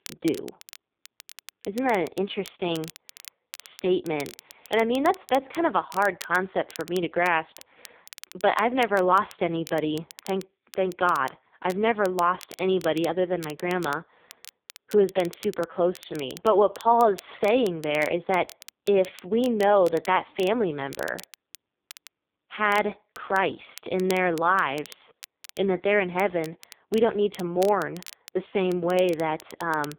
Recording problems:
phone-call audio; poor line
crackle, like an old record; faint; 20 dB below the speech

